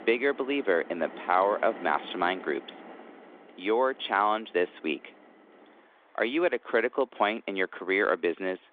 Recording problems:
phone-call audio; nothing above 3.5 kHz
traffic noise; noticeable; throughout; 20 dB below the speech

